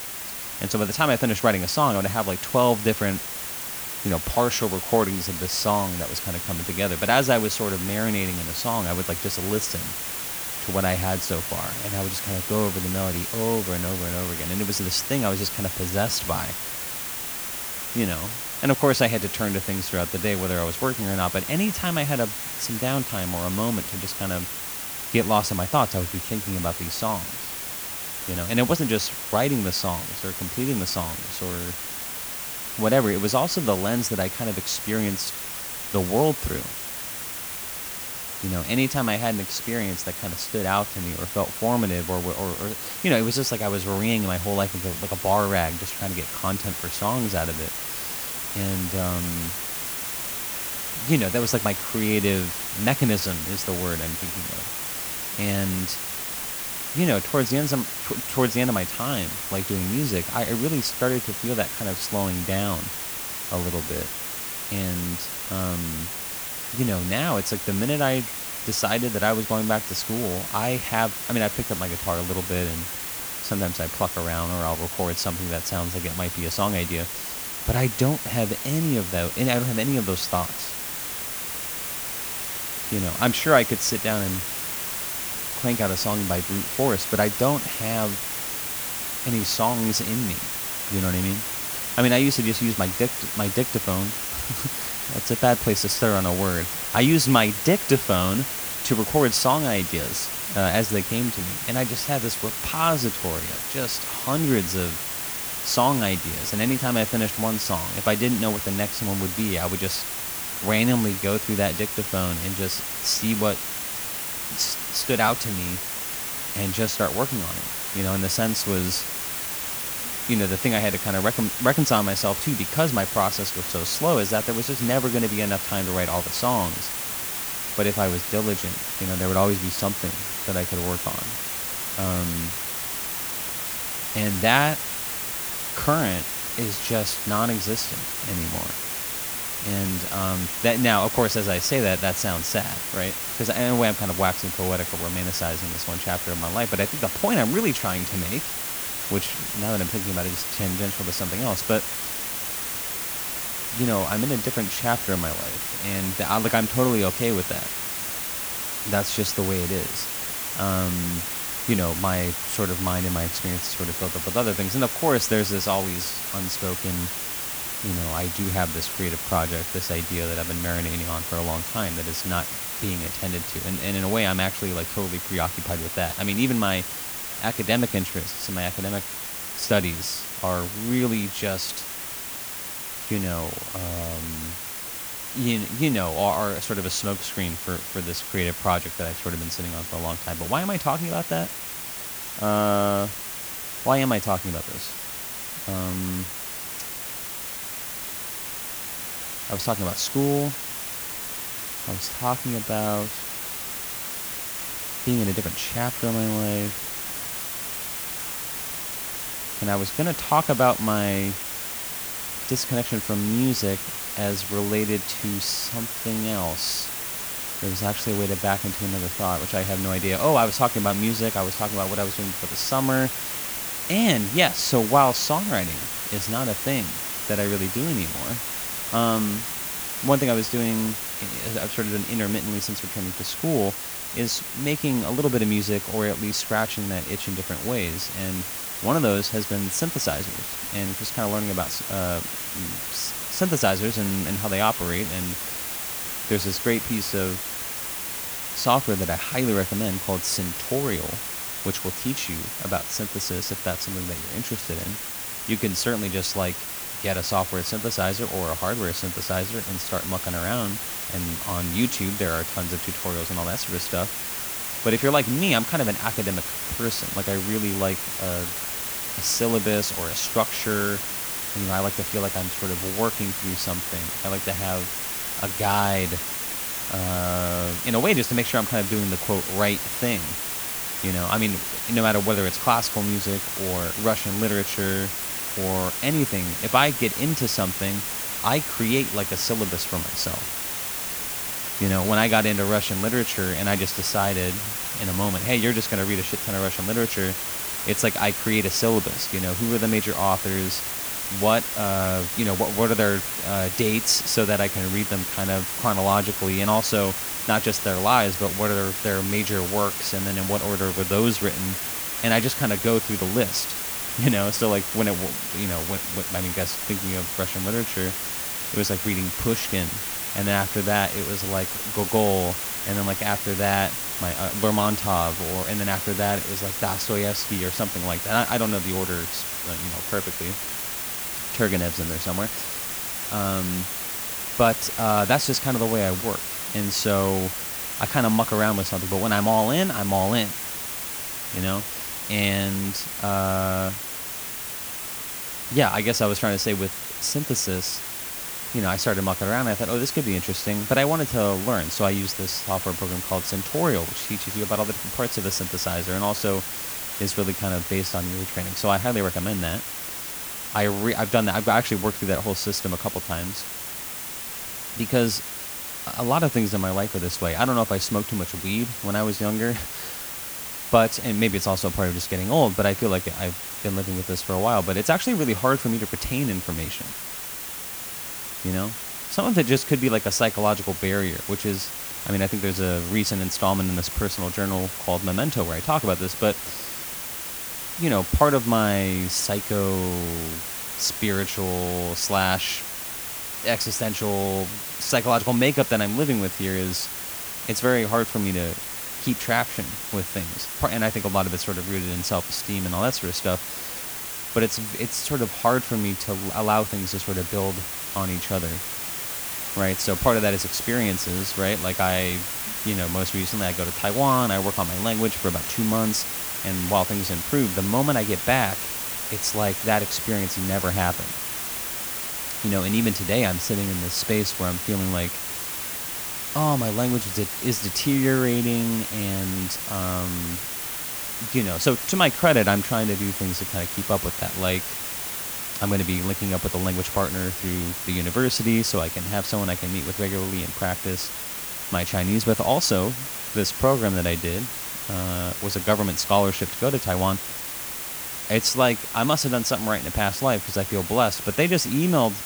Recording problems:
hiss; loud; throughout; 3 dB below the speech

